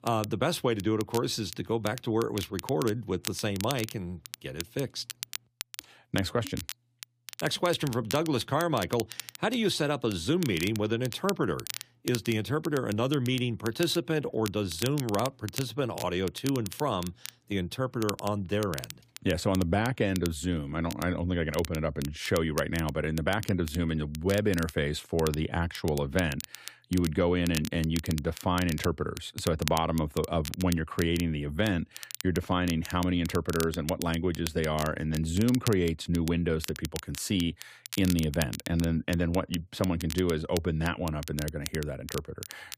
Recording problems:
crackle, like an old record; noticeable; 10 dB below the speech

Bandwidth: 15 kHz